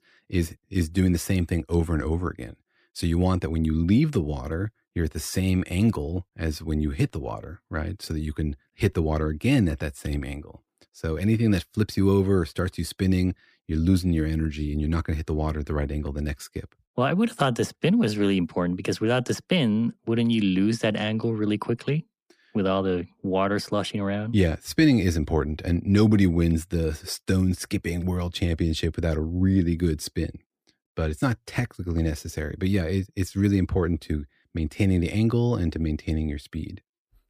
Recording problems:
none

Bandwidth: 15 kHz